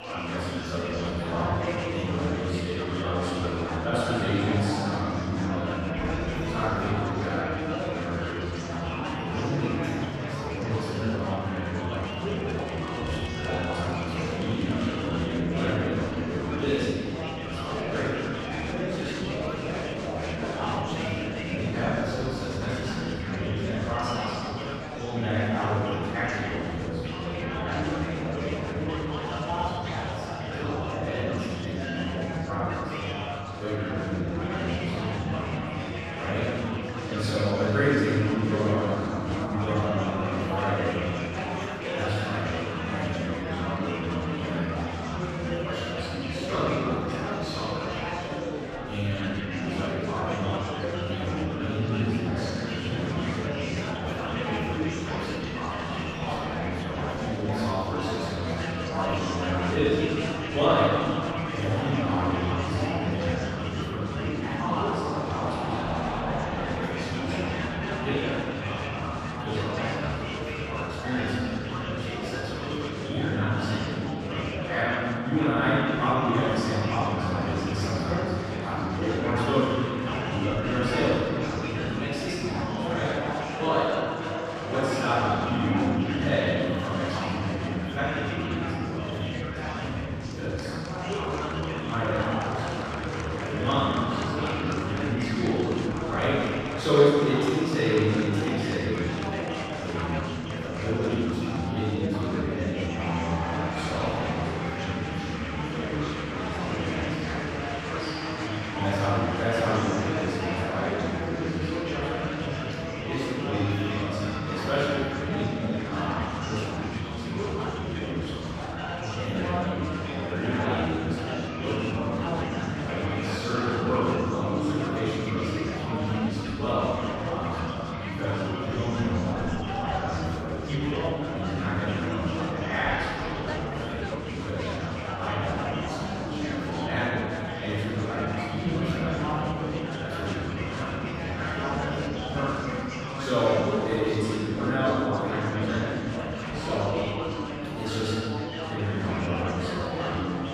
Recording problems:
room echo; strong; dies away in 3 s
off-mic speech; far
chatter from many people; loud; throughout; 3 dB below the speech

